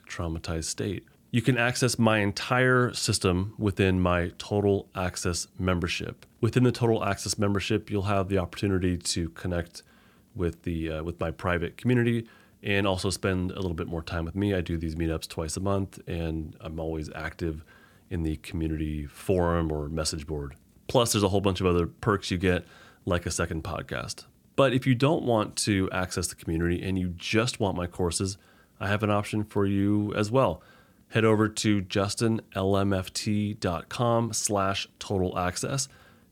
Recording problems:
none

